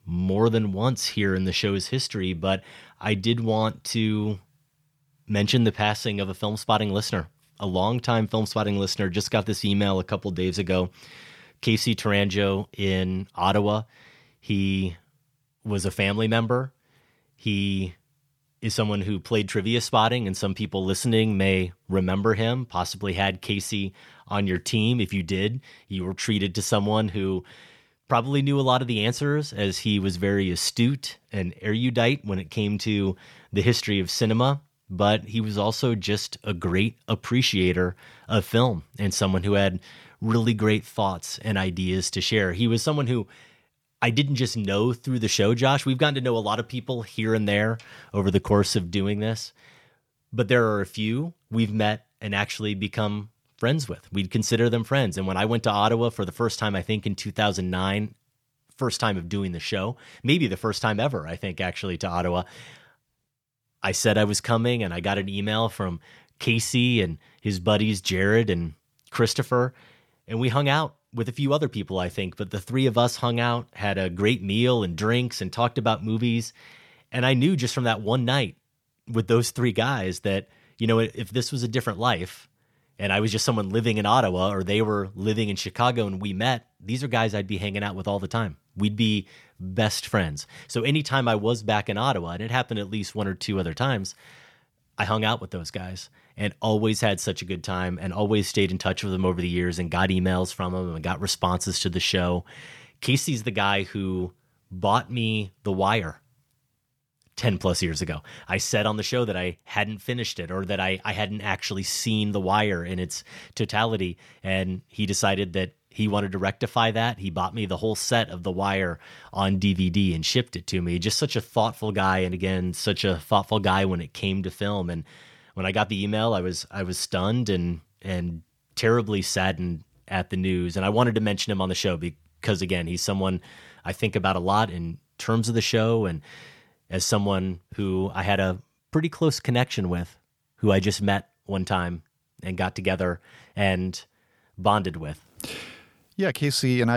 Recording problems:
abrupt cut into speech; at the end

